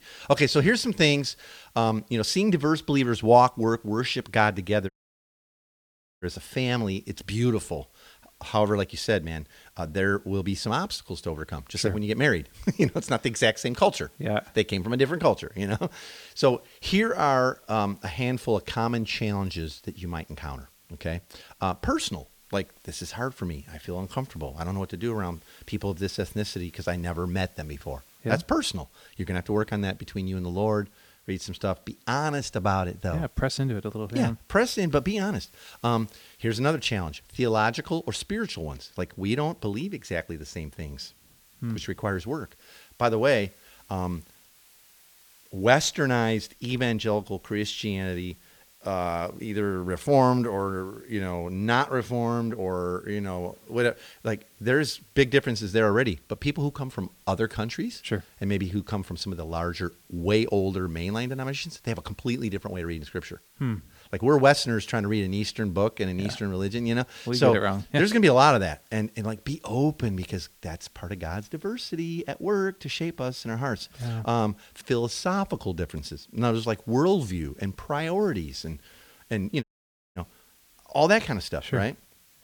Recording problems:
hiss; faint; throughout; 30 dB below the speech
audio cutting out; at 5 s for 1.5 s and at 1:20 for 0.5 s

